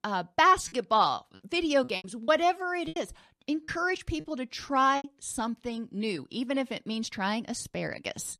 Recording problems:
choppy; very; from 2 to 3 s and from 3.5 to 5 s; 8% of the speech affected

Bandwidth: 13.5 kHz